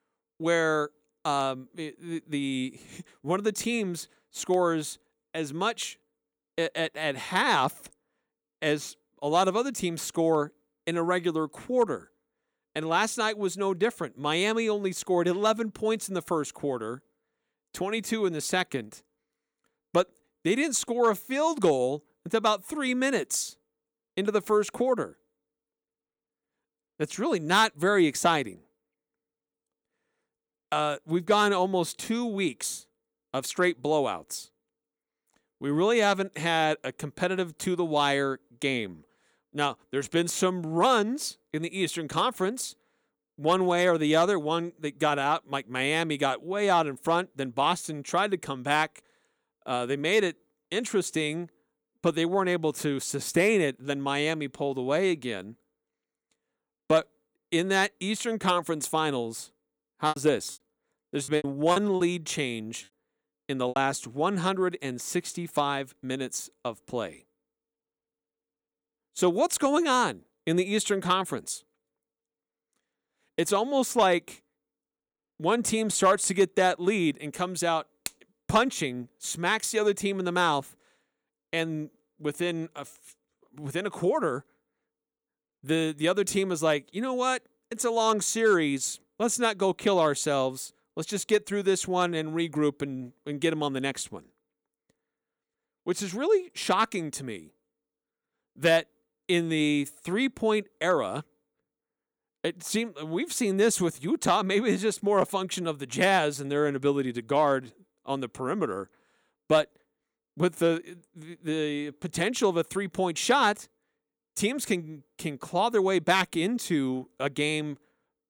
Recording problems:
choppy; very; from 1:00 to 1:04; 15% of the speech affected

